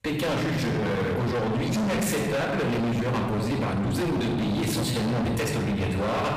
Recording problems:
distortion; heavy; 50% of the sound clipped
off-mic speech; far
room echo; noticeable; dies away in 1.2 s
uneven, jittery; strongly; from 1 to 5.5 s

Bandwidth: 15 kHz